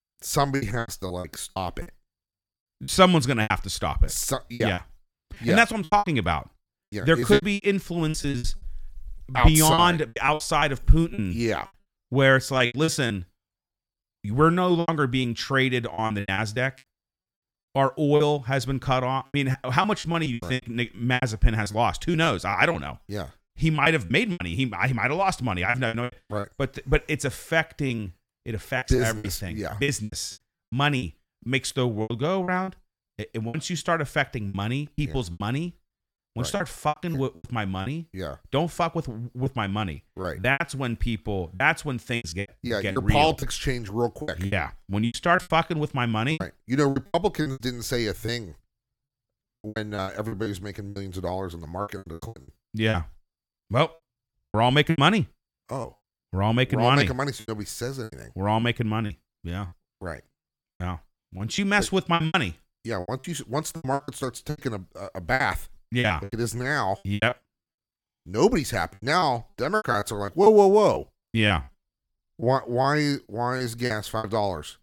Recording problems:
choppy; very; 13% of the speech affected

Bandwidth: 17.5 kHz